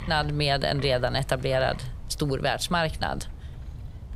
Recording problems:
wind noise on the microphone; occasional gusts; 20 dB below the speech

